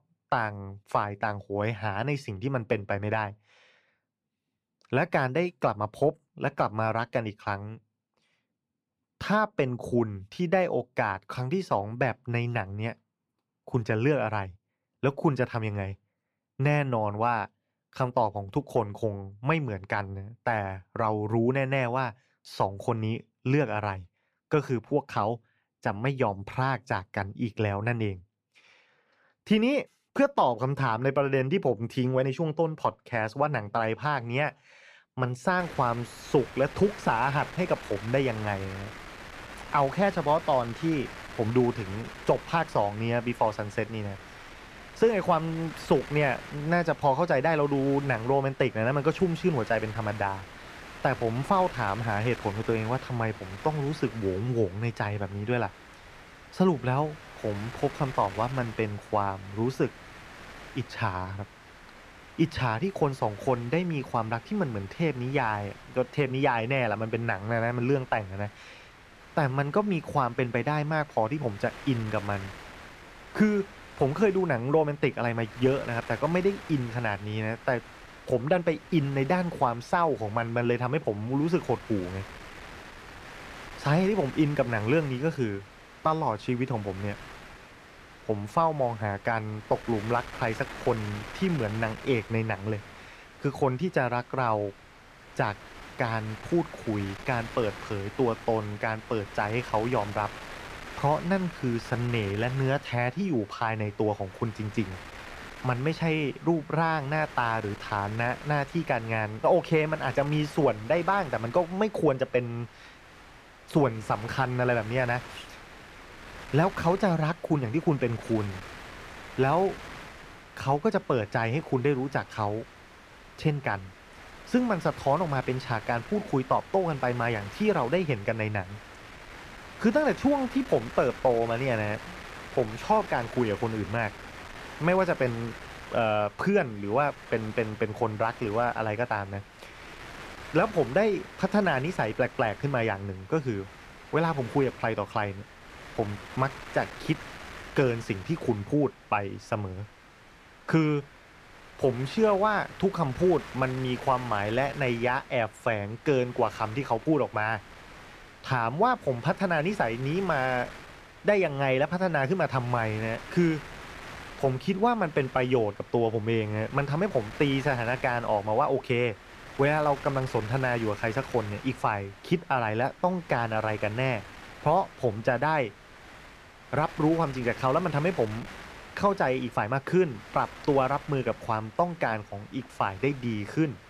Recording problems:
wind noise on the microphone; occasional gusts; from 36 s on; 15 dB below the speech

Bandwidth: 14.5 kHz